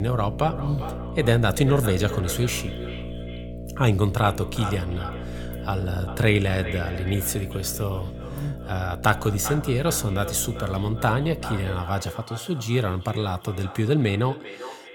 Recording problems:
echo of what is said; noticeable; throughout; 390 ms later, 15 dB below the speech
electrical hum; noticeable; until 12 s; 60 Hz, 15 dB below the speech
abrupt cut into speech; at the start

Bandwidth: 17.5 kHz